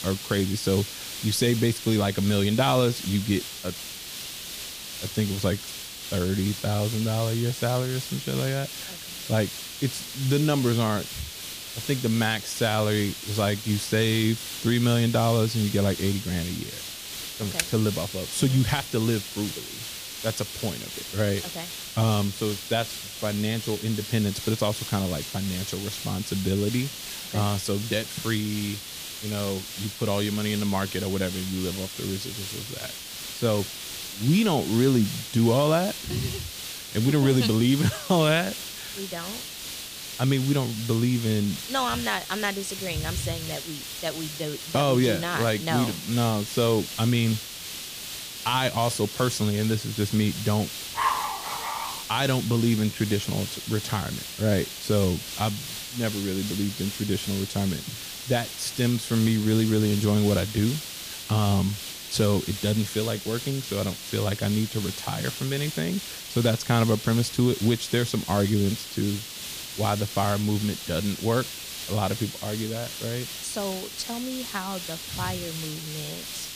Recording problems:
hiss; loud; throughout; 8 dB below the speech
keyboard typing; very faint; at 18 s; peak 4 dB below the speech
dog barking; loud; at 51 s; peak 1 dB above the speech

